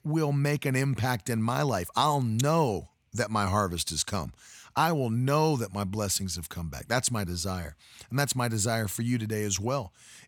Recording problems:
none

